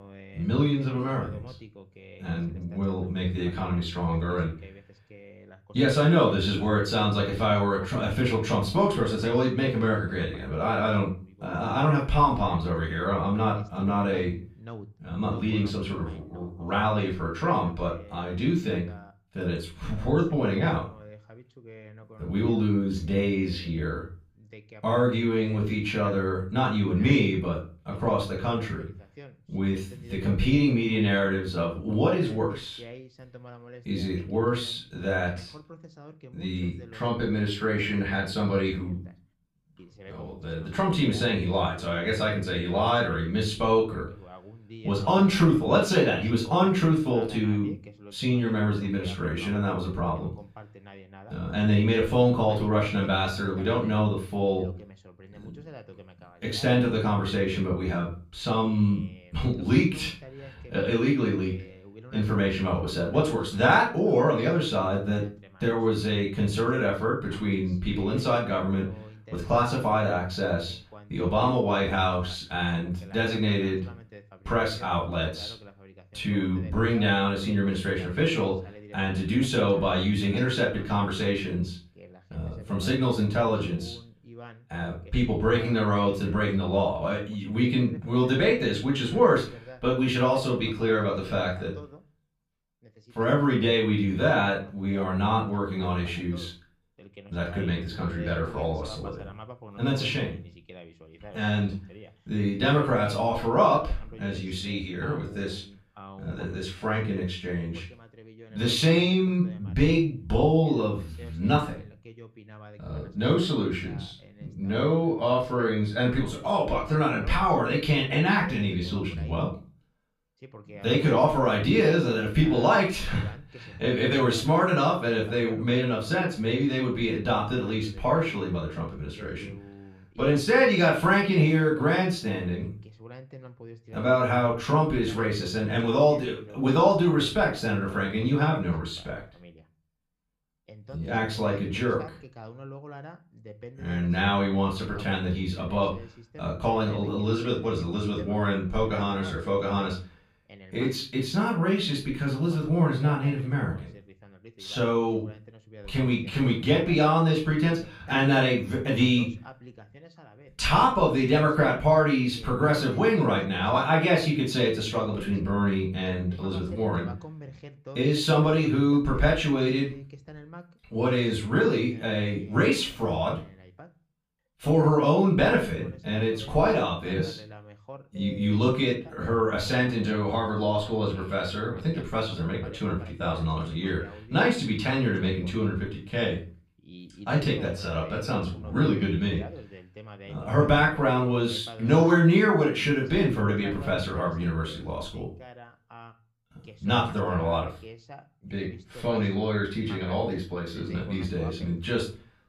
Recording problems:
off-mic speech; far
room echo; slight; dies away in 0.3 s
voice in the background; faint; throughout; 20 dB below the speech

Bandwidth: 15 kHz